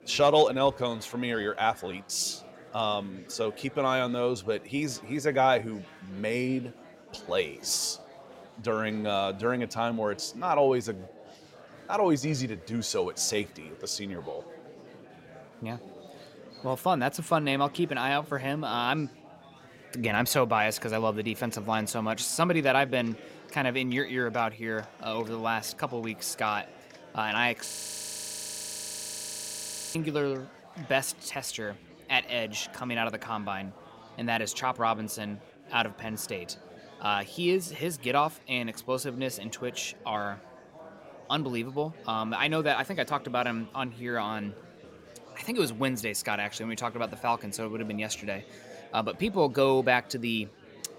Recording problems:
chatter from many people; faint; throughout; 20 dB below the speech
audio freezing; at 28 s for 2.5 s

